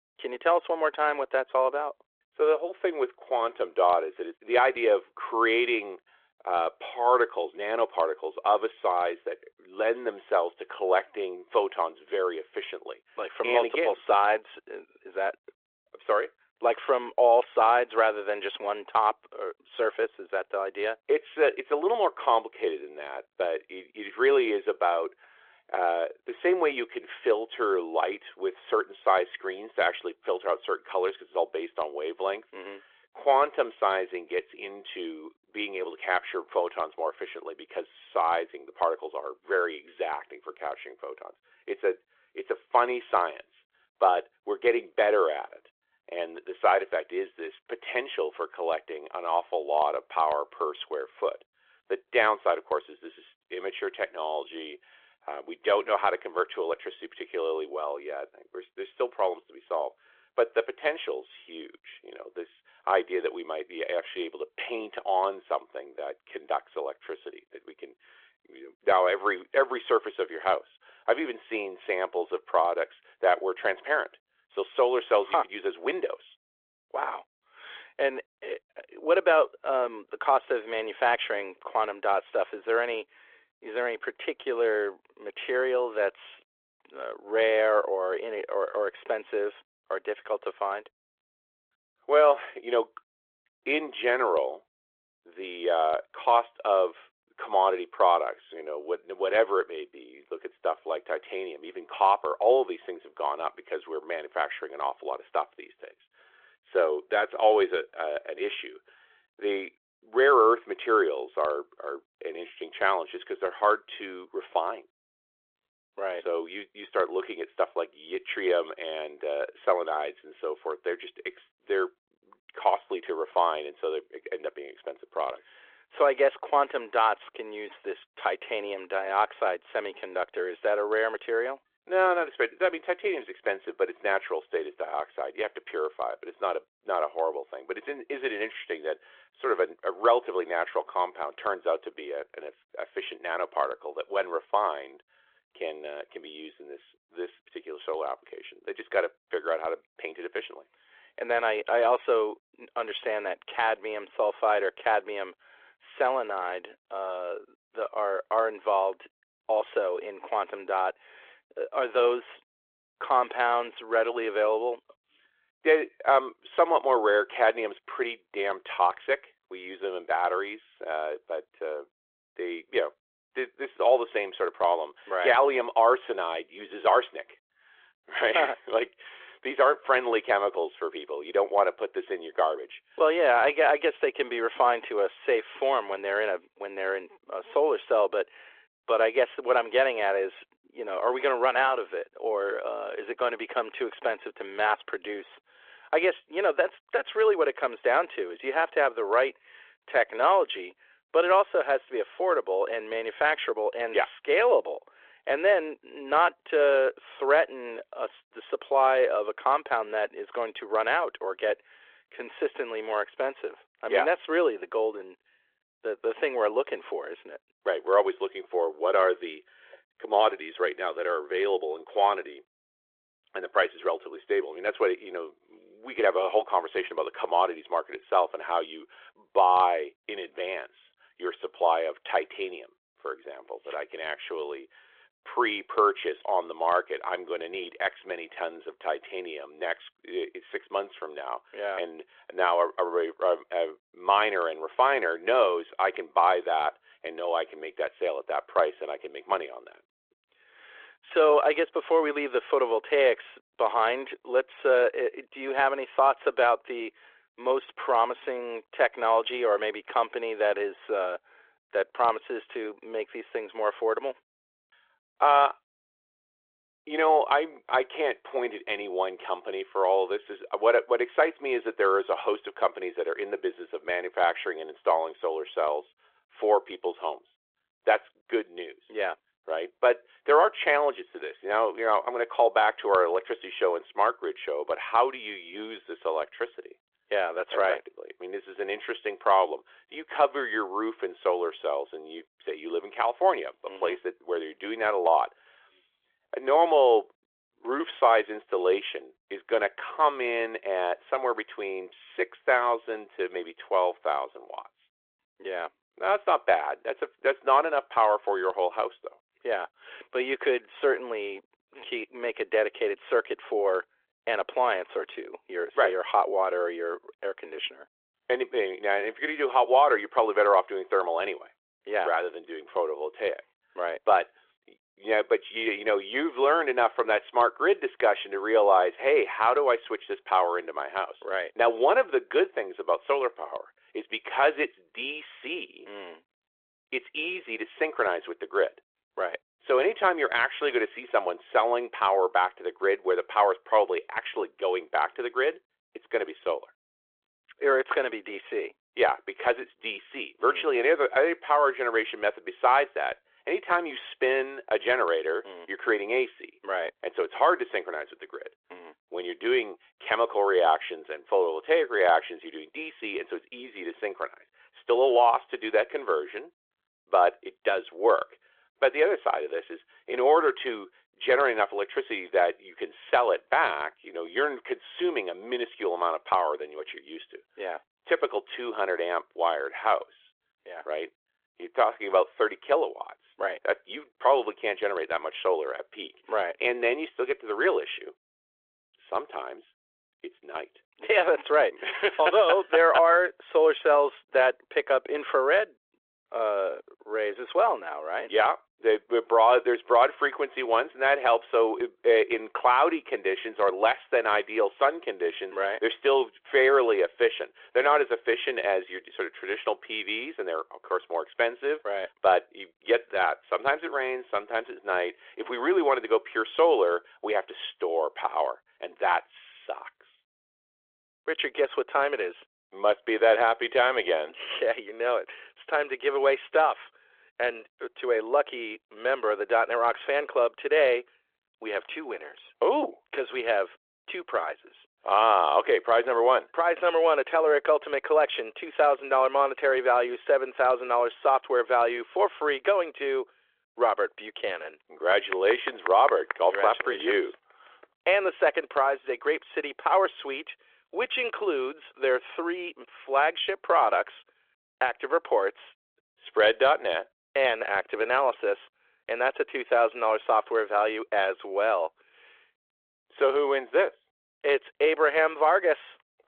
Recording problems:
phone-call audio

